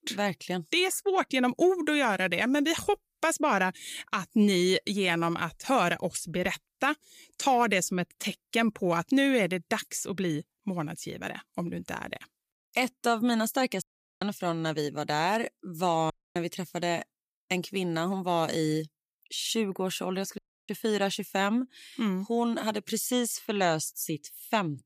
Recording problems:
audio cutting out; at 14 s, at 16 s and at 20 s

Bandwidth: 15 kHz